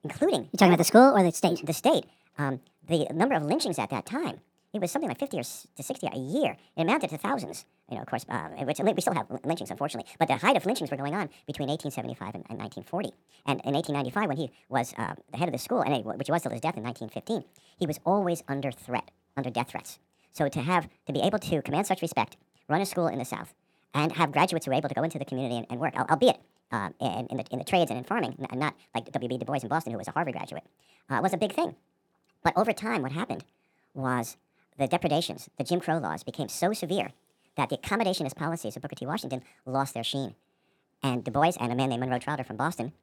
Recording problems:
wrong speed and pitch; too fast and too high; 1.5 times normal speed

